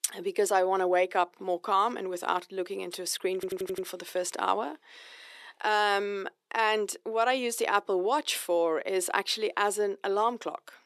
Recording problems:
thin; somewhat; fading below 350 Hz
audio stuttering; at 3.5 s

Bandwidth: 13.5 kHz